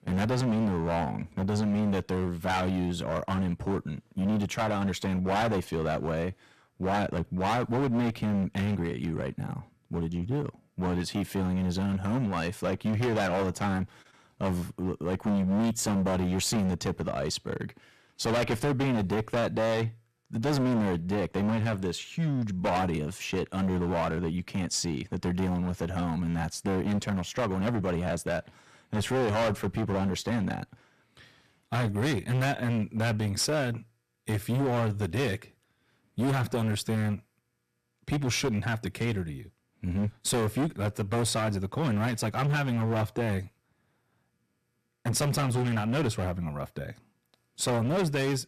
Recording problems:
distortion; heavy; 17% of the sound clipped

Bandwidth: 14.5 kHz